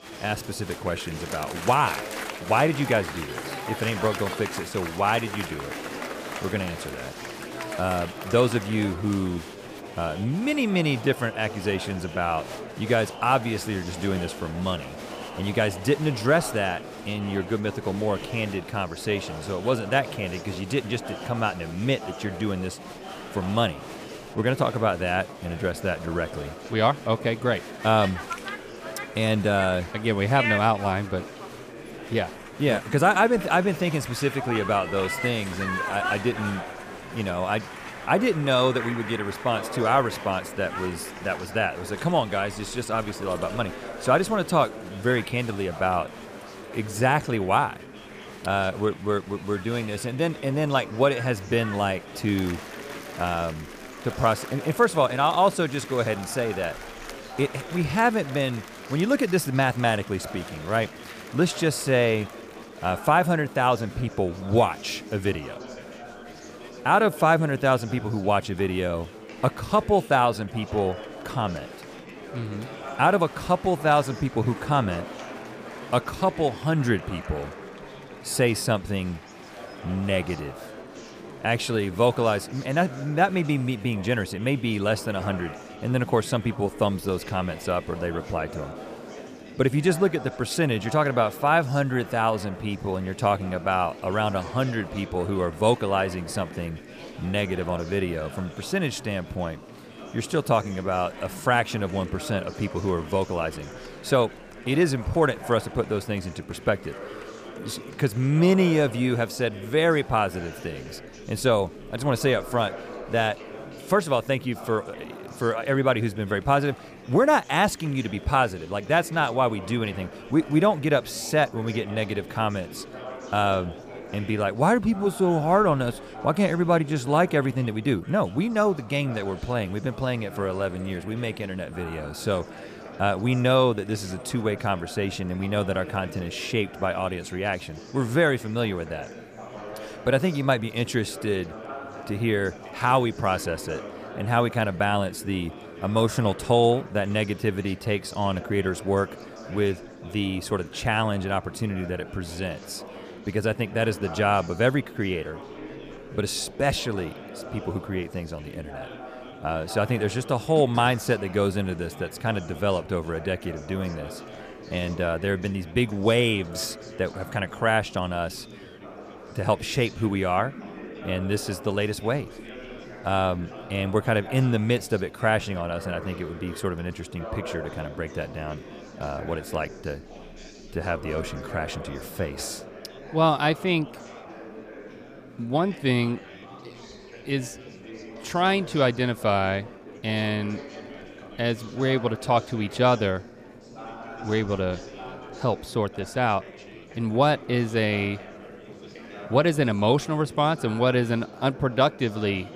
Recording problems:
chatter from many people; noticeable; throughout; 15 dB below the speech

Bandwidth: 15 kHz